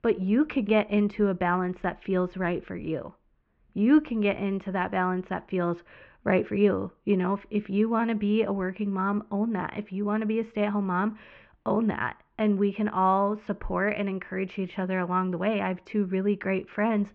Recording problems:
muffled; very; fading above 3 kHz

